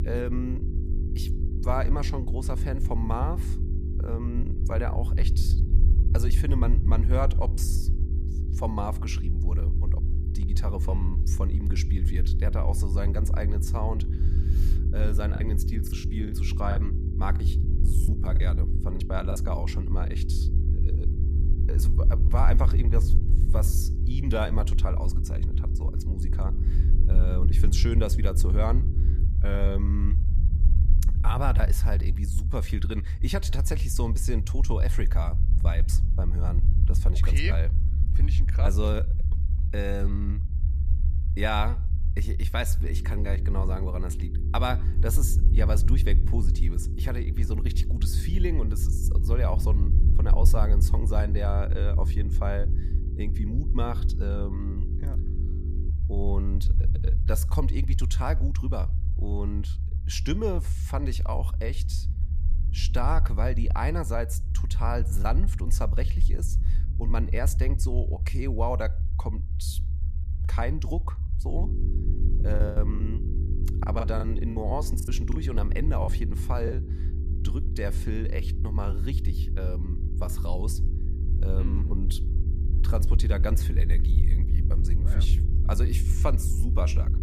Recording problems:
low rumble; loud; throughout; 10 dB below the speech
electrical hum; noticeable; until 29 s, from 43 to 56 s and from 1:12 on; 50 Hz, 10 dB below the speech
choppy; very; from 15 to 19 s and from 1:13 to 1:17; 12% of the speech affected

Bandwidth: 14.5 kHz